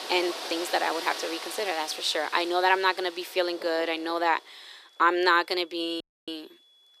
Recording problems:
thin; very; fading below 350 Hz
rain or running water; noticeable; throughout; 10 dB below the speech
high-pitched whine; faint; throughout; 3.5 kHz, 30 dB below the speech
audio cutting out; at 6 s

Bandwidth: 15 kHz